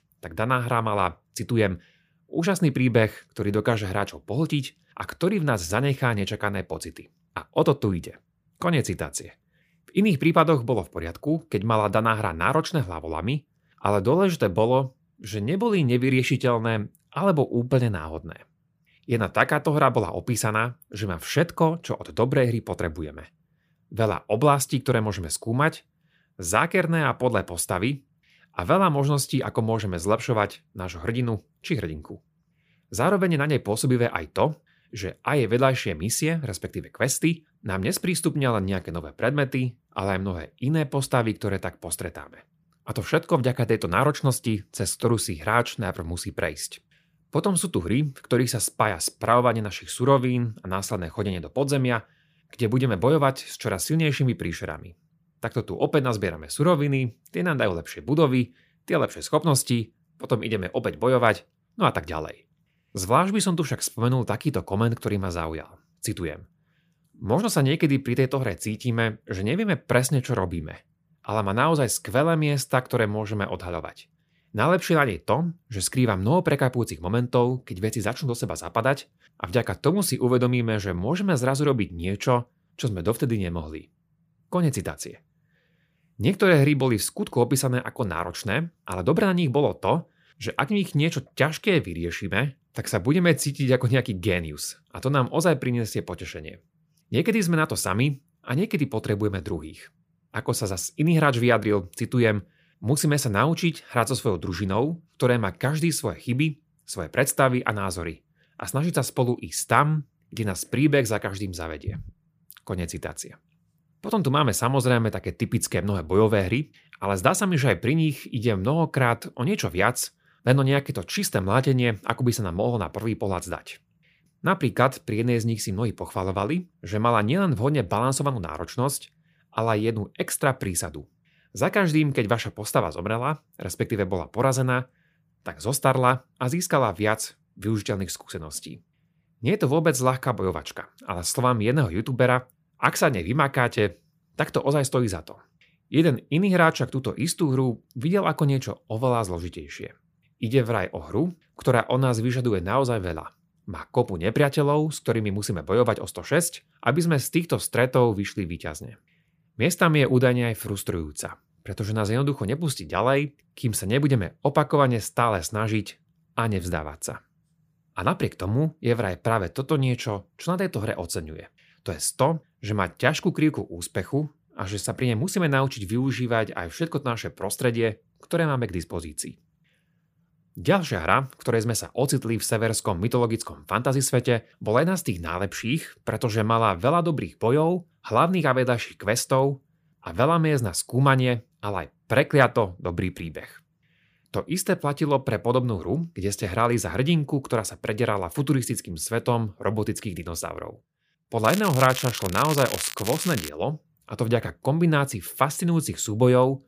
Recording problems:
crackling; loud; from 3:21 to 3:23; 8 dB below the speech

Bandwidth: 15 kHz